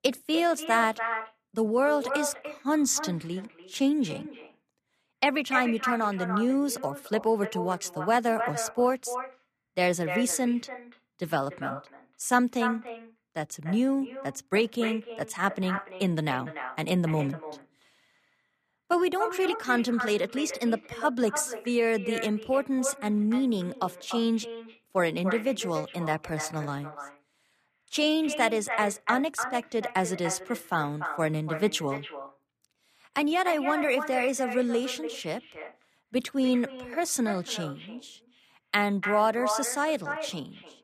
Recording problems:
echo of what is said; strong; throughout; 290 ms later, 9 dB below the speech

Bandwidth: 14.5 kHz